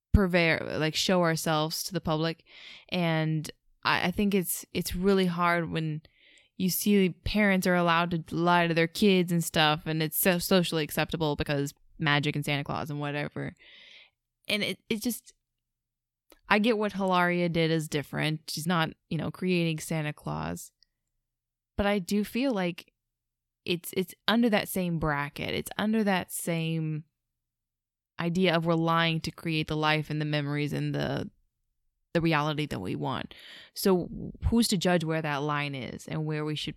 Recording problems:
uneven, jittery; strongly; from 2.5 to 35 s

